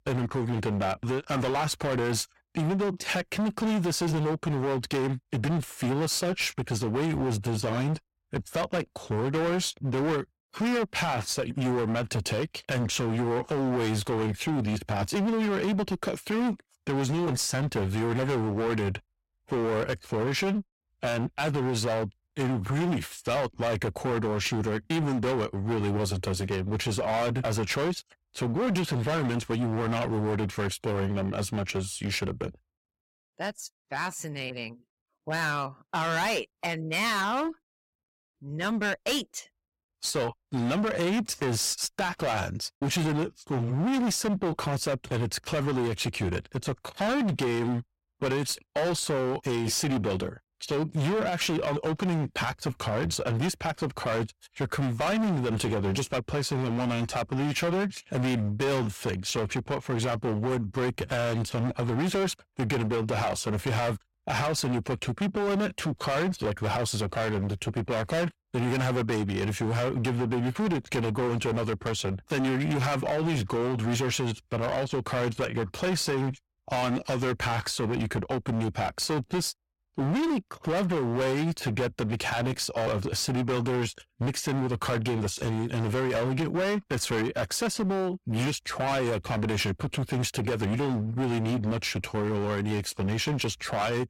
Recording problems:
distortion; heavy; 25% of the sound clipped

